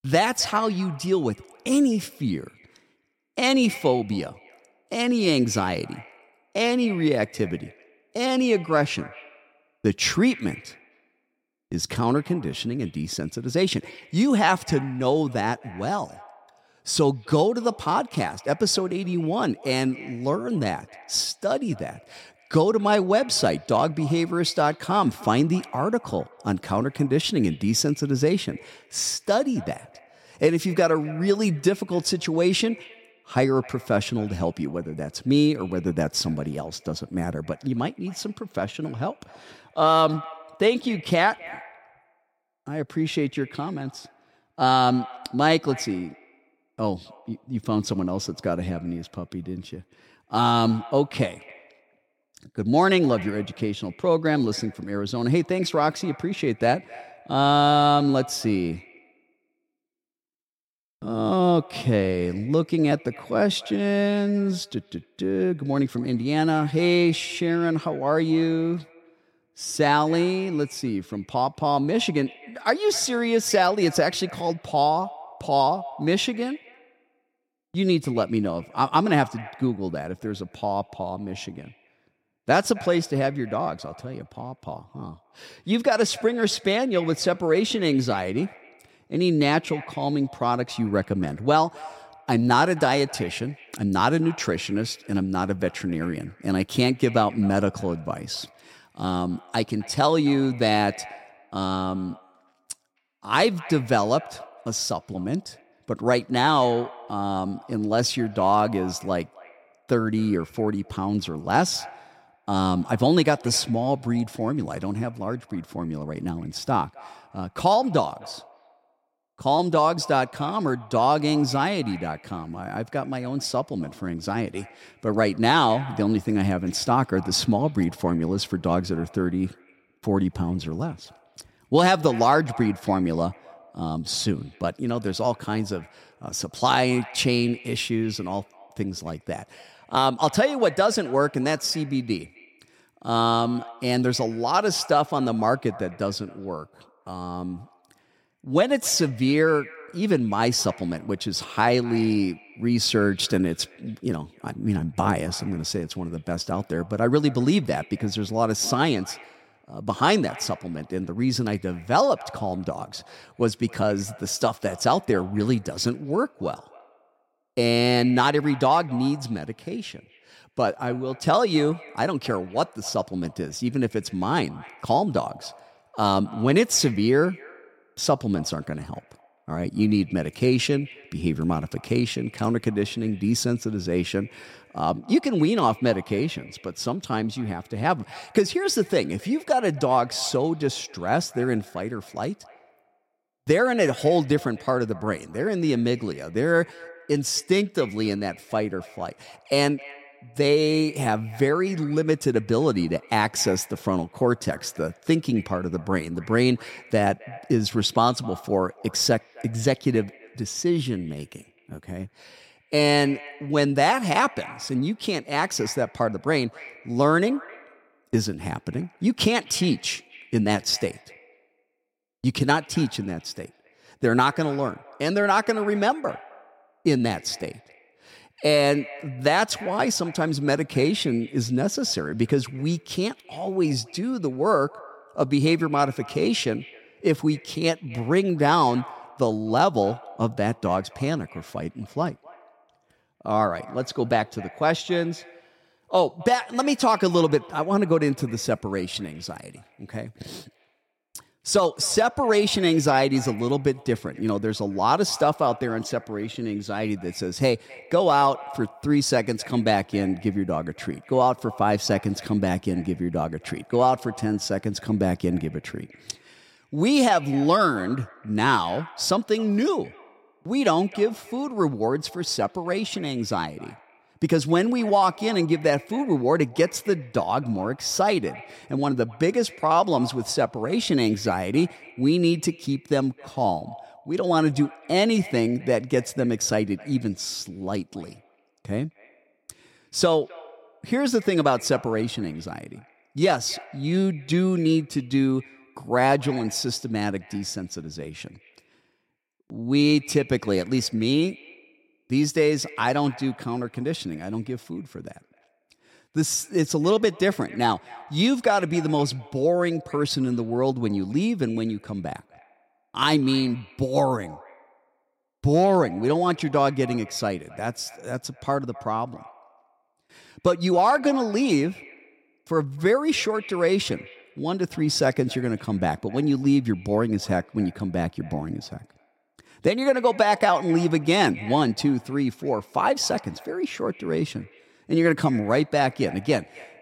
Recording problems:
echo of what is said; faint; throughout; 260 ms later, 20 dB below the speech

